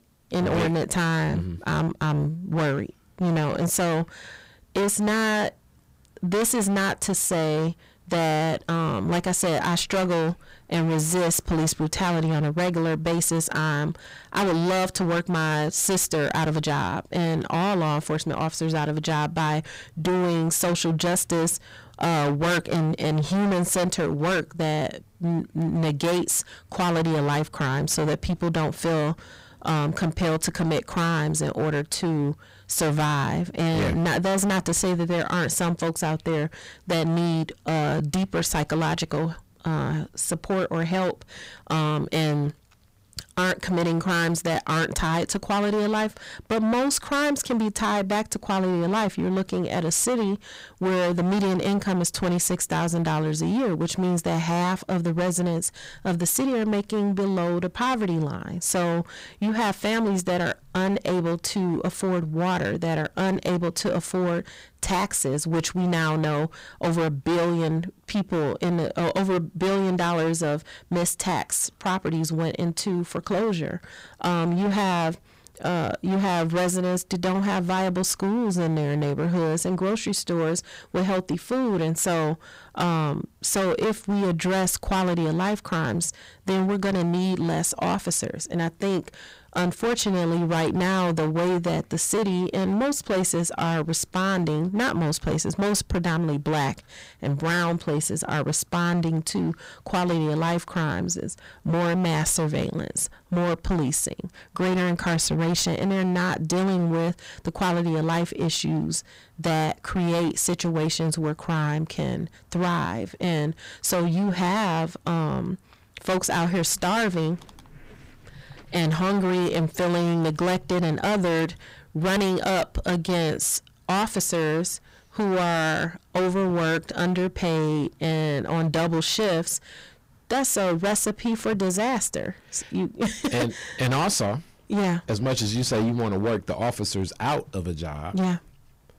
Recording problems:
distortion; heavy; 24% of the sound clipped

